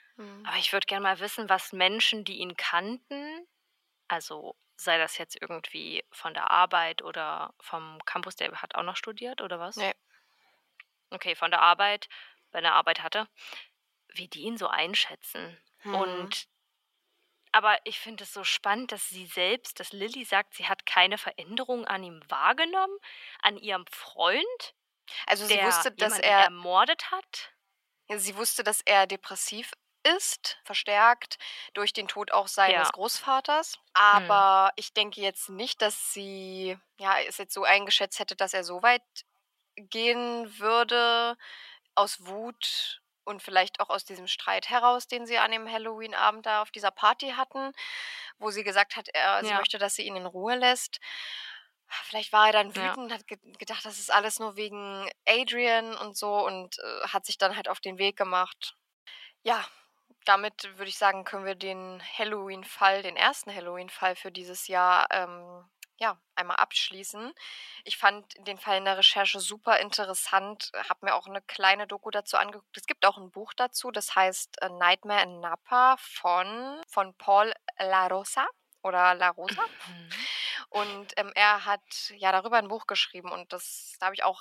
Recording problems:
thin; very; fading below 850 Hz

